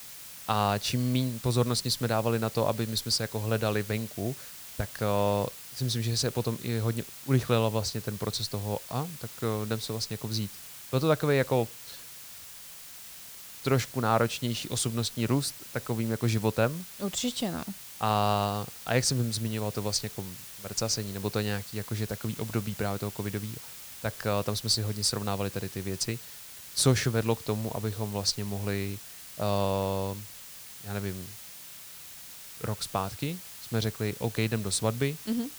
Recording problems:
hiss; noticeable; throughout; 10 dB below the speech

